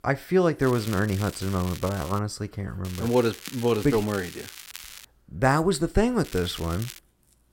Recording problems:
crackling; noticeable; from 0.5 to 2 s, from 3 to 5 s and at 6 s; 15 dB below the speech

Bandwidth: 16.5 kHz